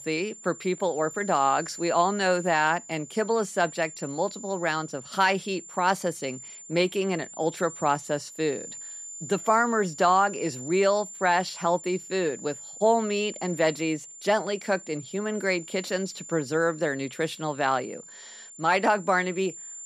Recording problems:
high-pitched whine; noticeable; throughout; 7 kHz, 15 dB below the speech

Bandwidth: 14.5 kHz